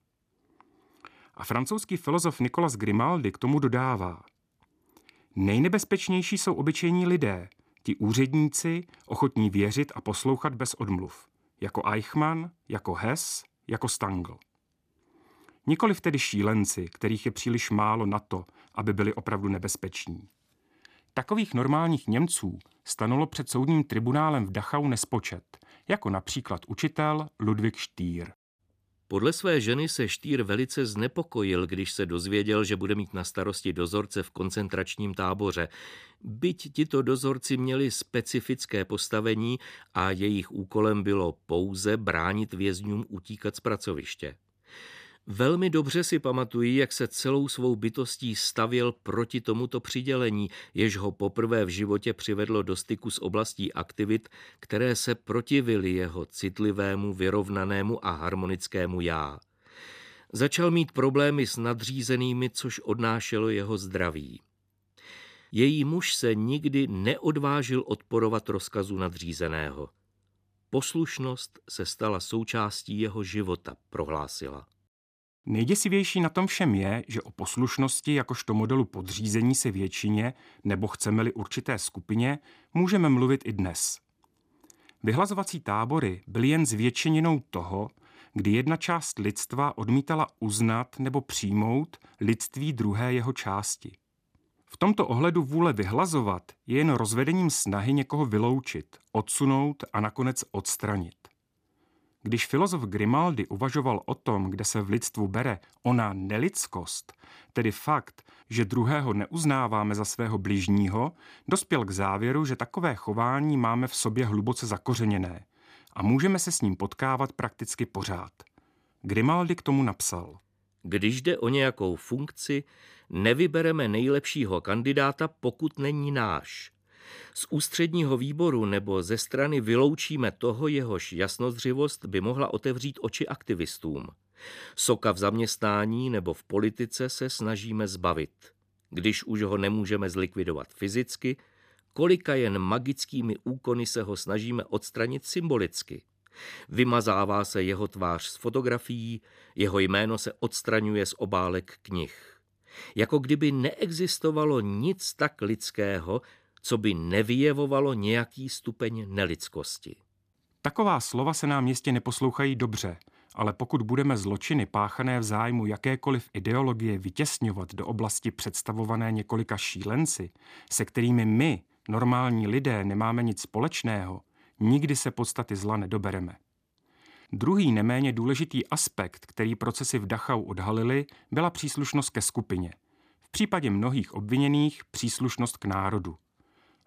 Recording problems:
none

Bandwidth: 15 kHz